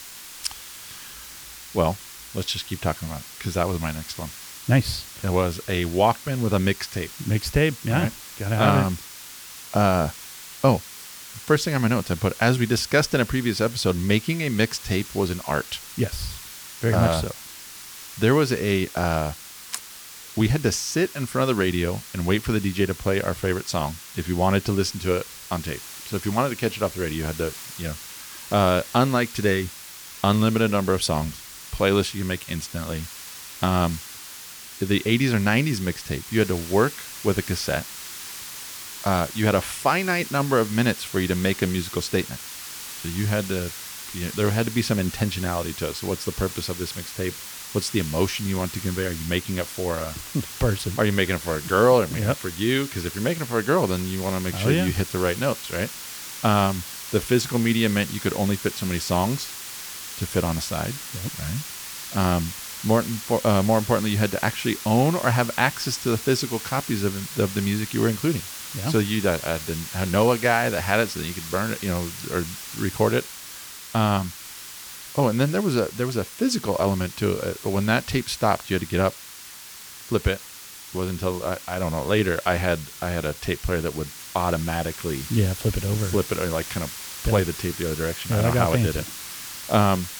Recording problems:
hiss; noticeable; throughout; 10 dB below the speech

